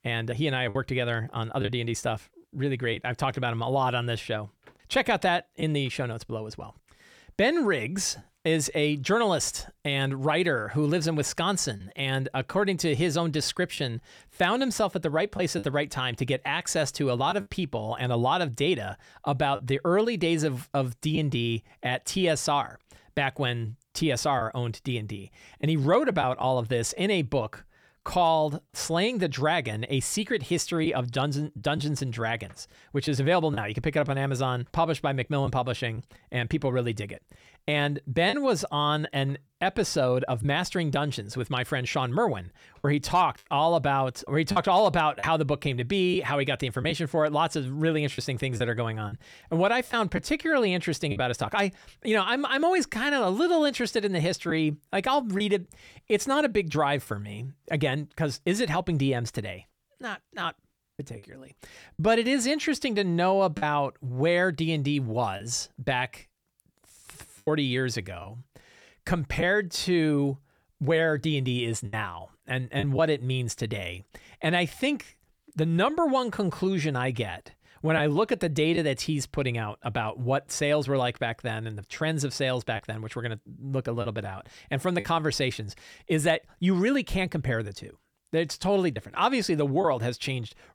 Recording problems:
choppy; occasionally; 2% of the speech affected

